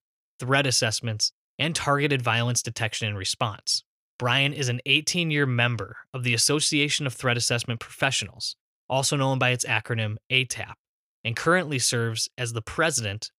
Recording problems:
none

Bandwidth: 15.5 kHz